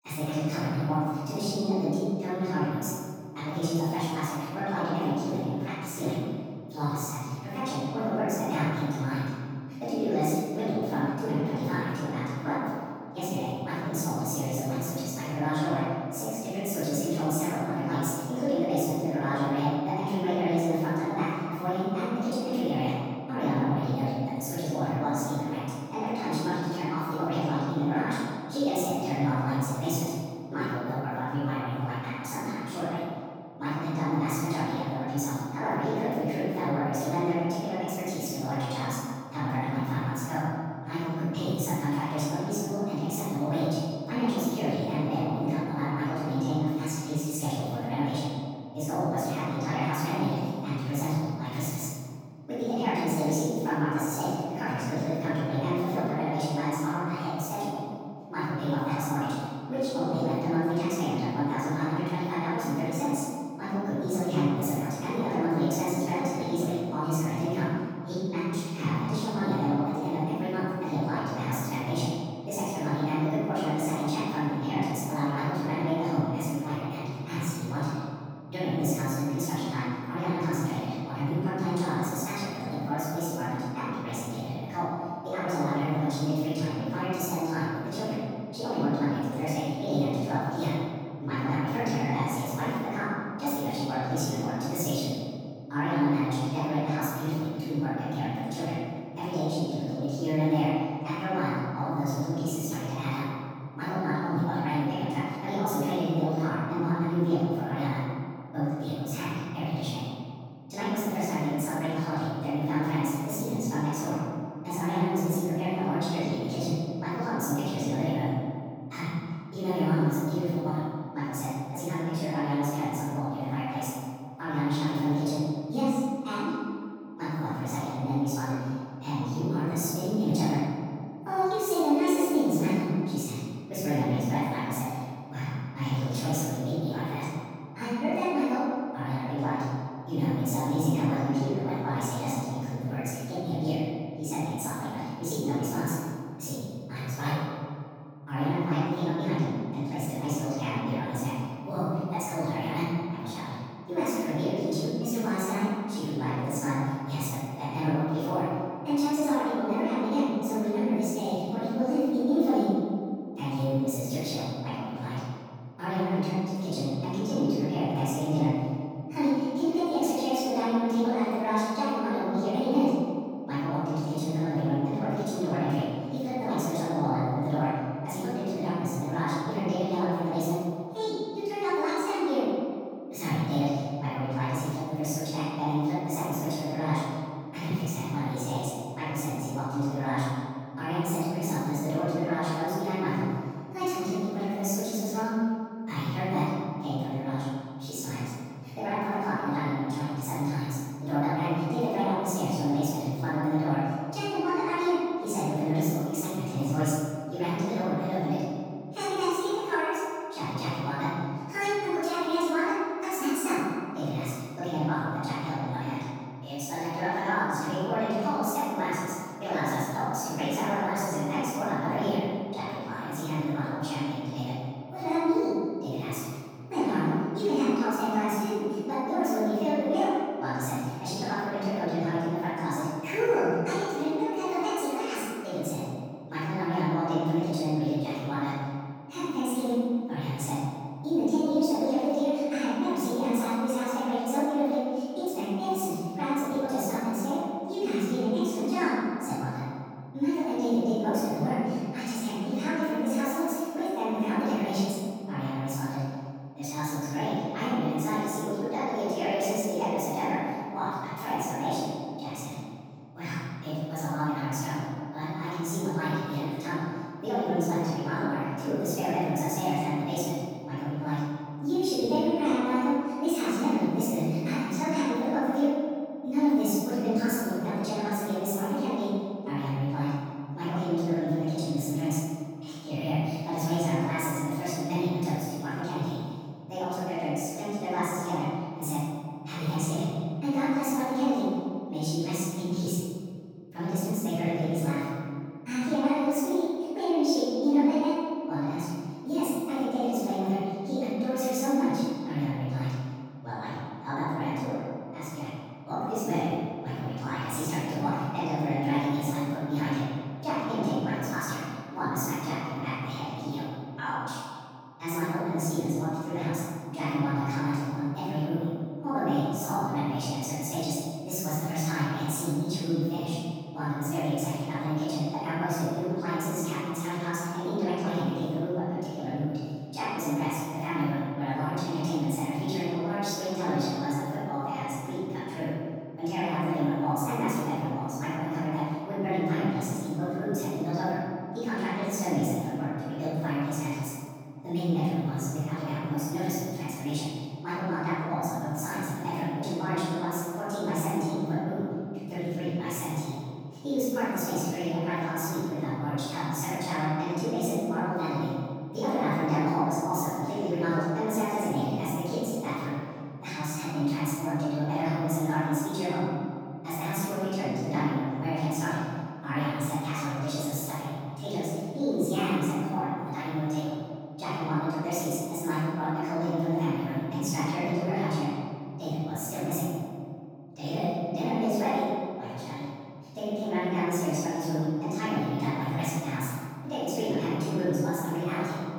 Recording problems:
room echo; strong; dies away in 2.2 s
off-mic speech; far
wrong speed and pitch; too fast and too high; 1.5 times normal speed

